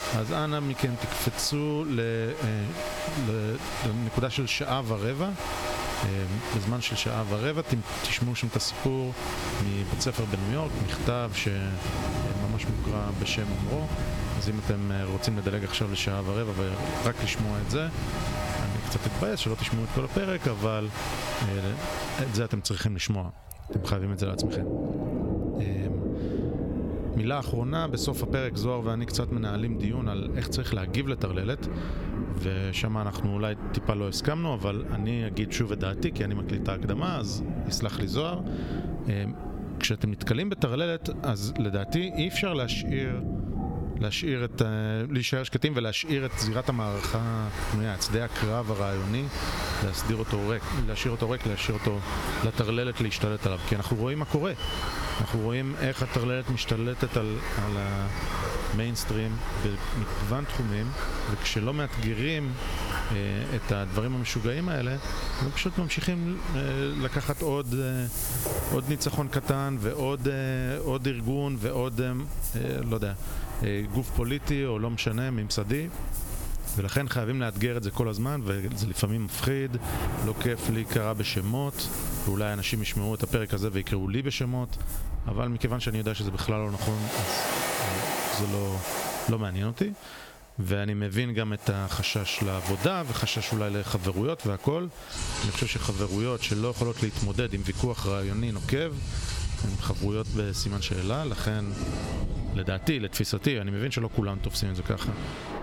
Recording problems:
squashed, flat; somewhat, background pumping
rain or running water; loud; throughout; 6 dB below the speech

